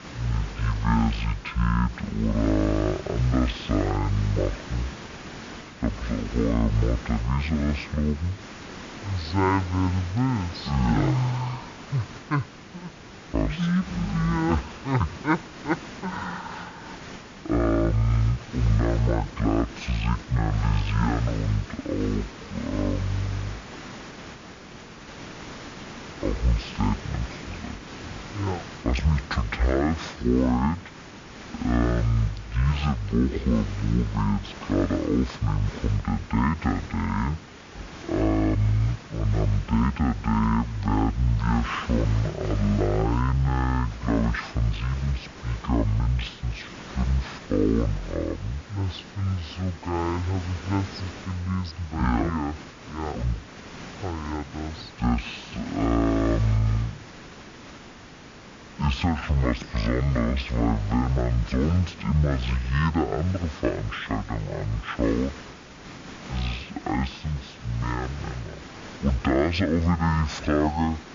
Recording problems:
wrong speed and pitch; too slow and too low; 0.5 times normal speed
hiss; noticeable; throughout; 15 dB below the speech

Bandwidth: 7 kHz